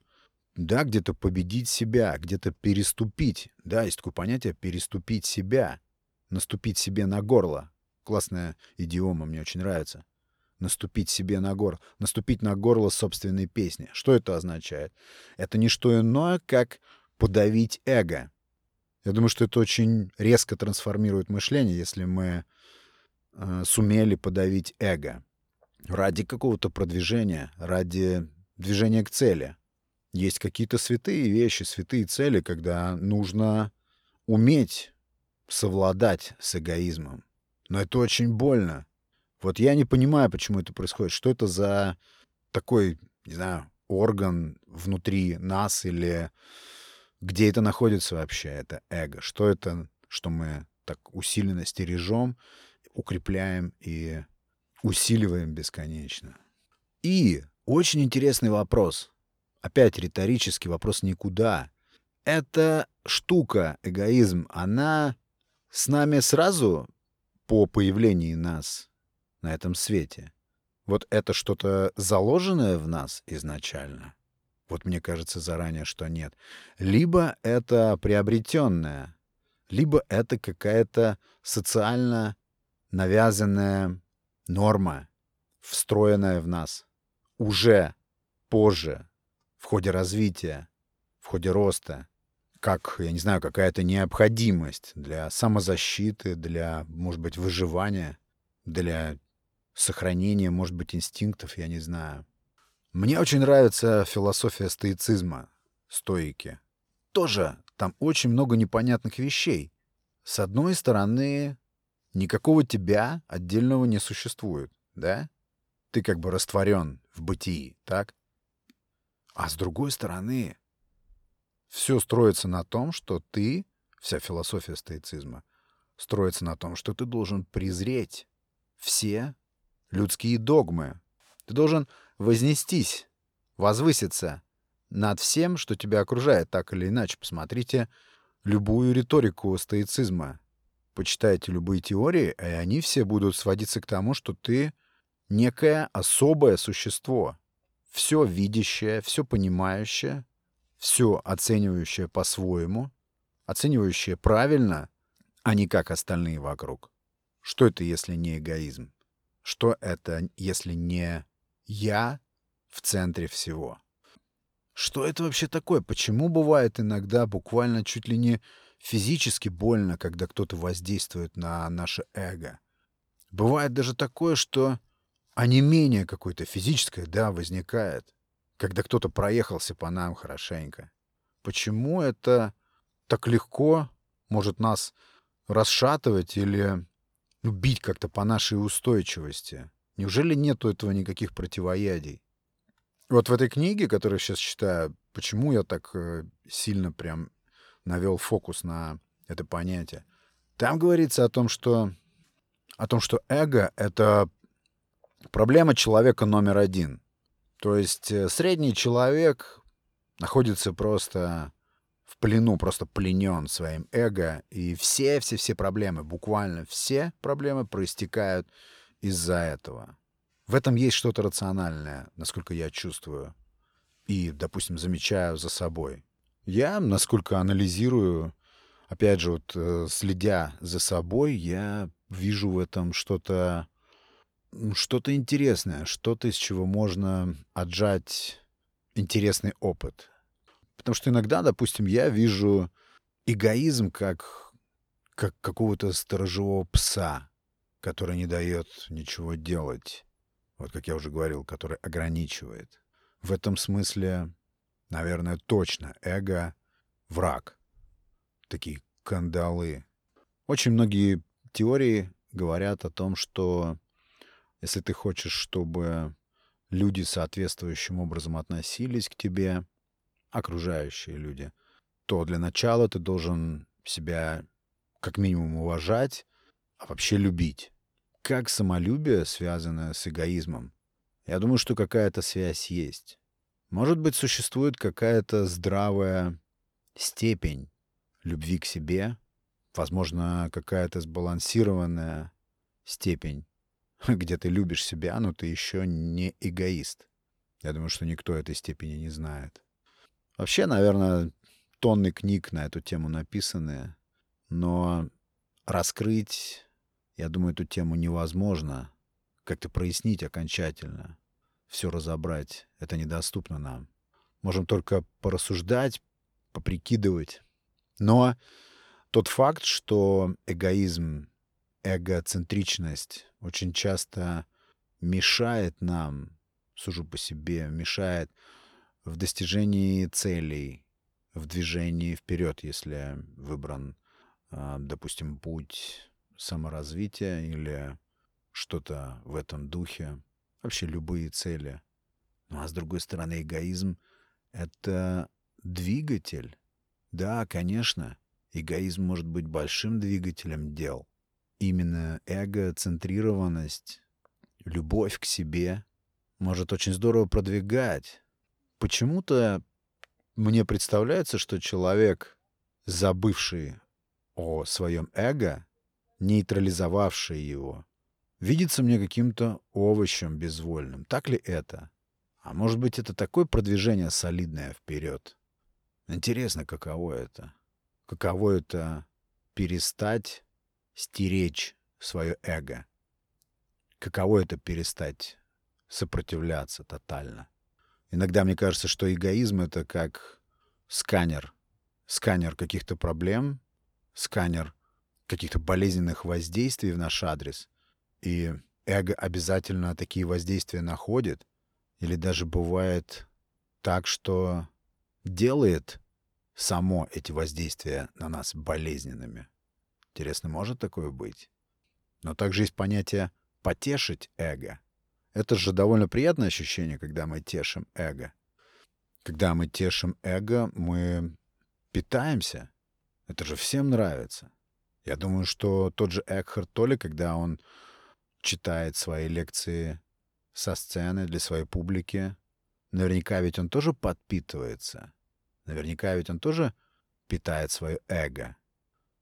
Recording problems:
none

